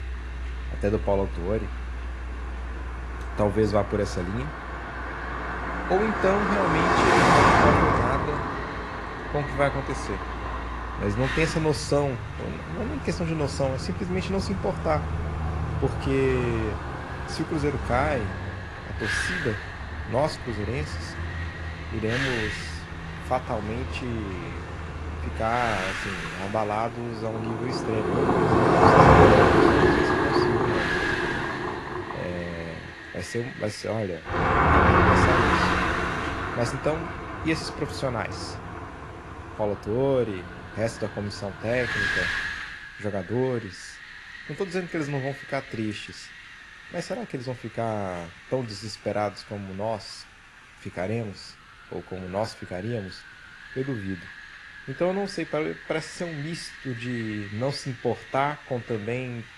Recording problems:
garbled, watery; slightly
traffic noise; very loud; until 42 s; 4 dB above the speech
wind noise on the microphone; heavy; 4 dB below the speech

